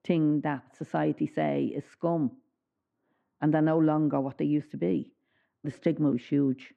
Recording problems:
muffled; very; fading above 1.5 kHz

